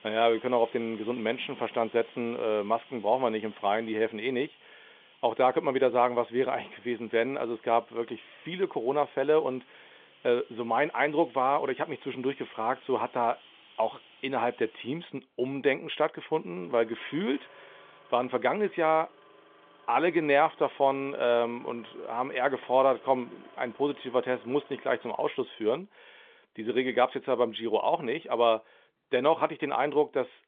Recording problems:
phone-call audio; nothing above 3.5 kHz
traffic noise; faint; throughout; 25 dB below the speech

